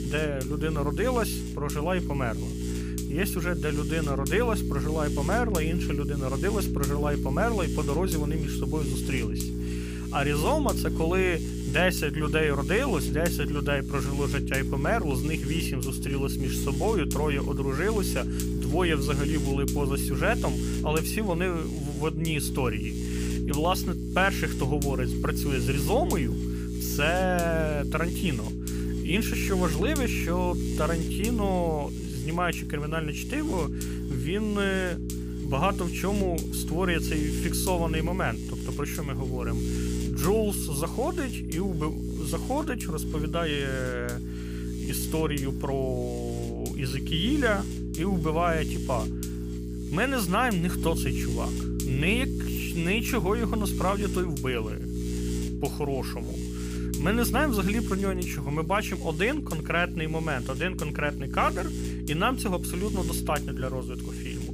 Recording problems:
electrical hum; loud; throughout; 60 Hz, 8 dB below the speech

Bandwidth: 15 kHz